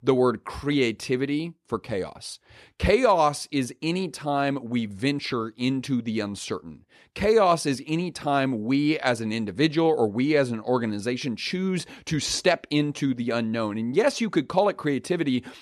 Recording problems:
none

